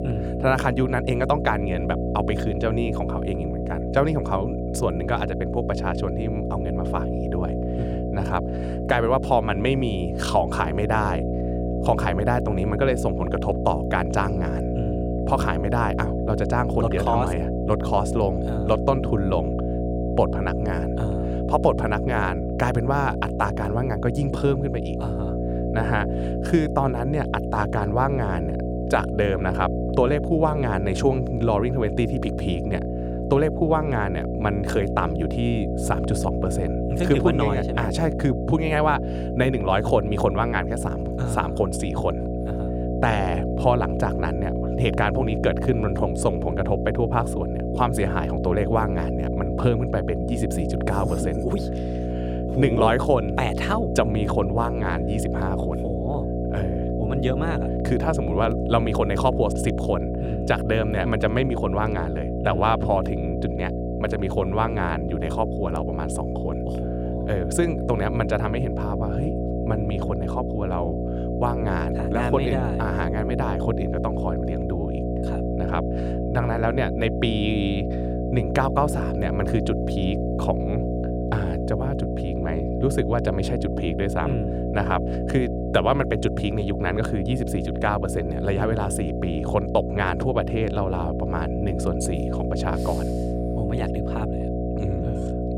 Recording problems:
electrical hum; loud; throughout; 60 Hz, 5 dB below the speech

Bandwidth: 18 kHz